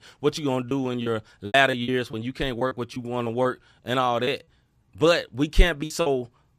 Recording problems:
choppy; very; from 0.5 to 2 s, at 2.5 s and from 4 to 6 s; 13% of the speech affected

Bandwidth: 14.5 kHz